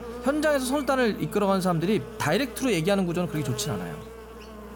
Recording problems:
electrical hum; noticeable; throughout; 60 Hz, 15 dB below the speech

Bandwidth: 17.5 kHz